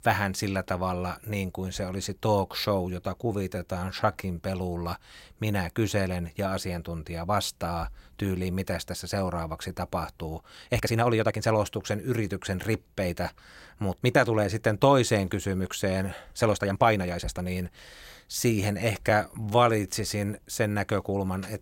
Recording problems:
uneven, jittery; strongly; from 3 to 20 s

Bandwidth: 16 kHz